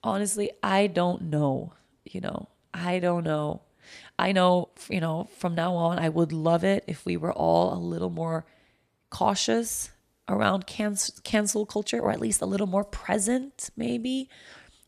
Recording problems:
uneven, jittery; strongly; from 2.5 to 14 s

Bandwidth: 14.5 kHz